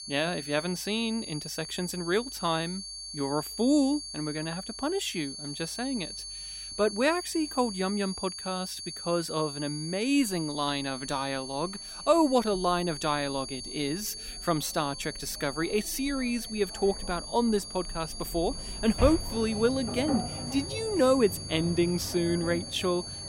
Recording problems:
high-pitched whine; loud; throughout; 4.5 kHz, 8 dB below the speech
machinery noise; noticeable; throughout; 10 dB below the speech

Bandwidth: 16 kHz